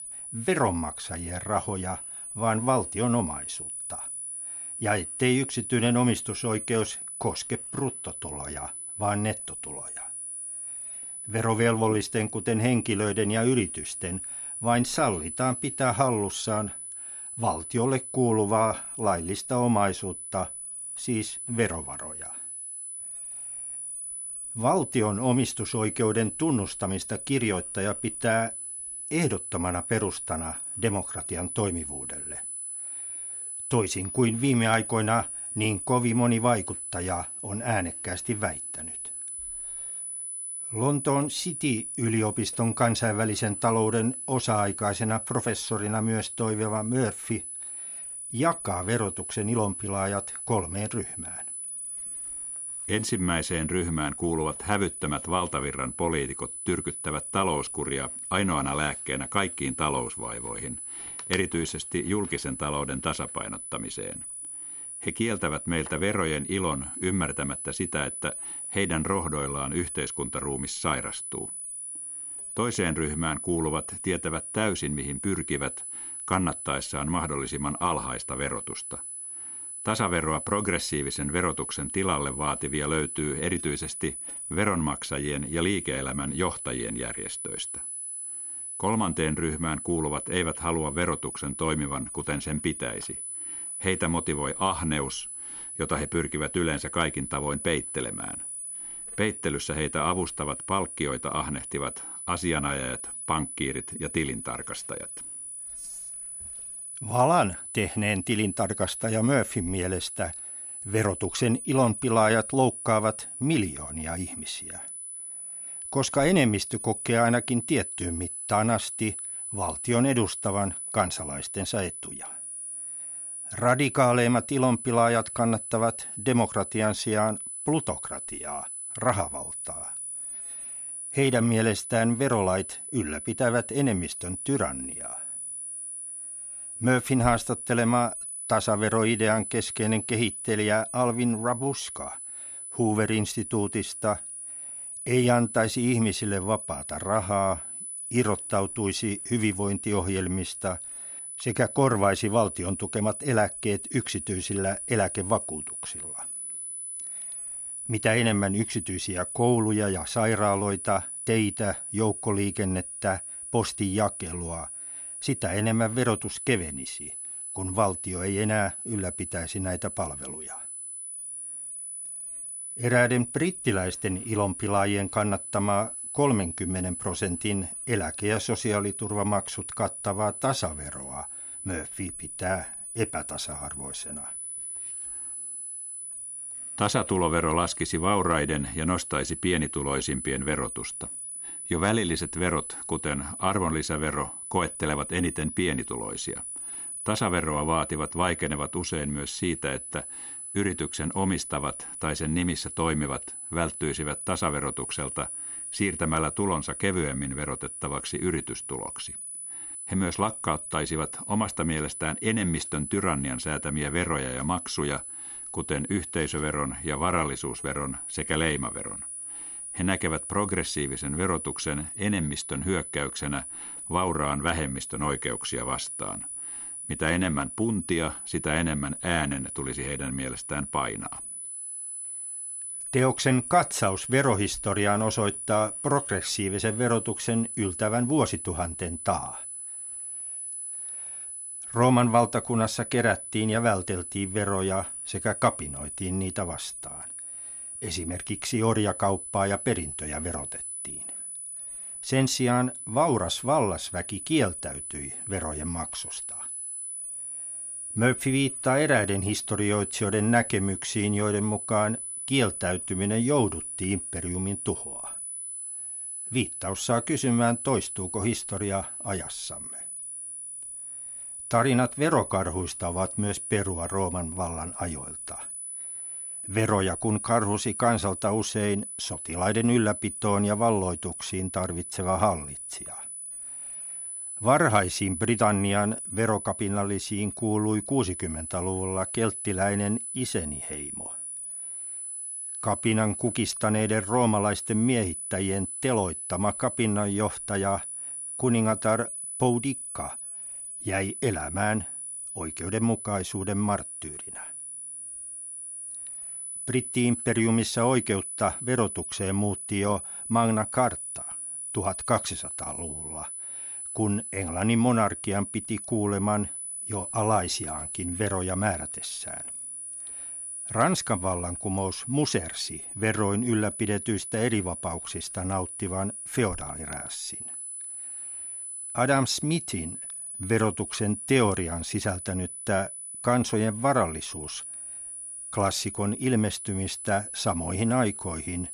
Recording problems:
high-pitched whine; loud; throughout; 10 kHz, 6 dB below the speech

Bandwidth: 13.5 kHz